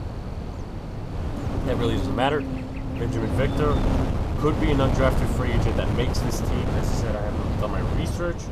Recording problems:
wind noise on the microphone; heavy; 4 dB below the speech
electrical hum; loud; throughout; 50 Hz, 10 dB below the speech

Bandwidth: 14.5 kHz